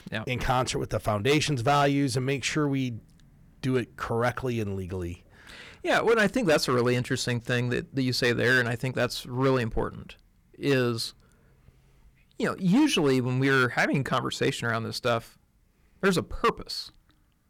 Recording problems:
distortion; slight; 4% of the sound clipped

